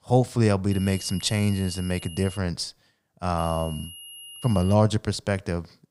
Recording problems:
high-pitched whine; noticeable; from 0.5 to 2.5 s and from 3.5 to 4.5 s; 3 kHz, 15 dB below the speech

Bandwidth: 15.5 kHz